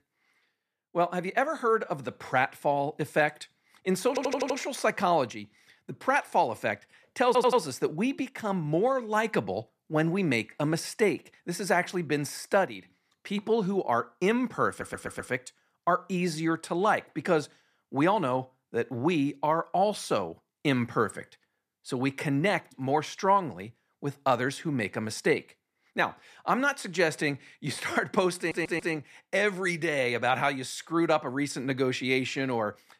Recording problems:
audio stuttering; 4 times, first at 4 s

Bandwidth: 14.5 kHz